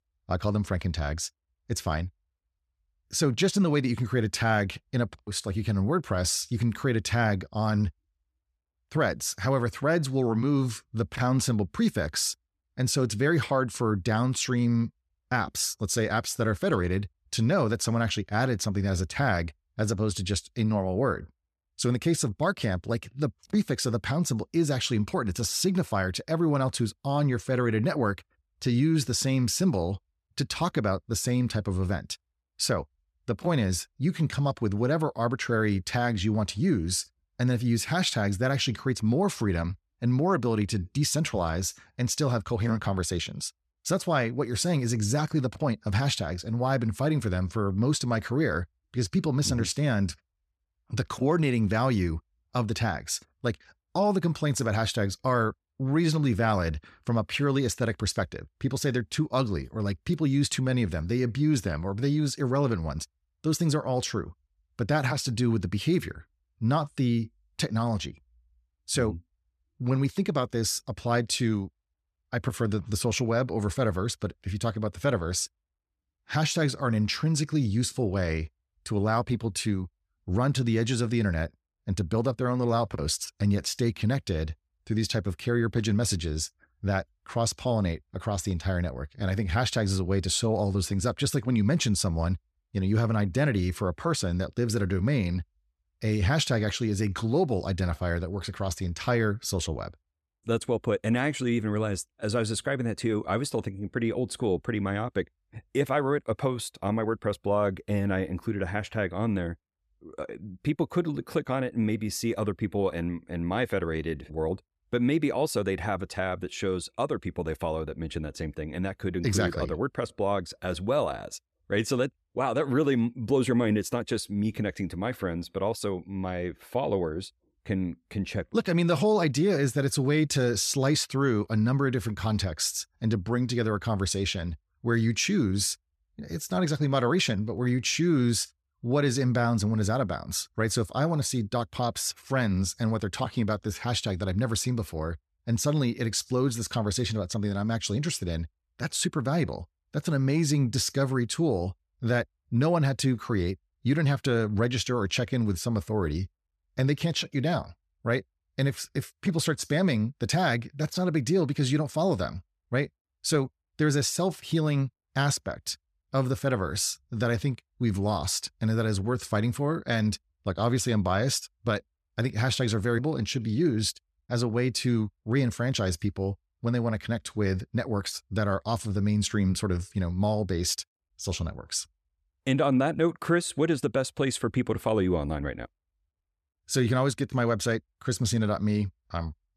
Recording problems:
none

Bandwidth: 14 kHz